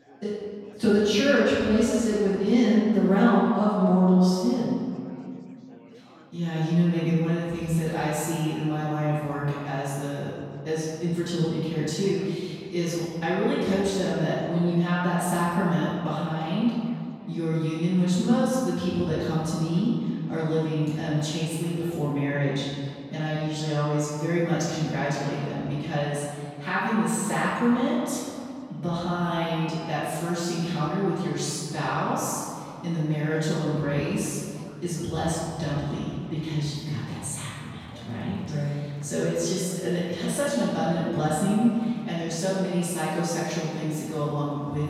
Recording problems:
room echo; strong; dies away in 2.1 s
off-mic speech; far
chatter from many people; faint; throughout; 25 dB below the speech

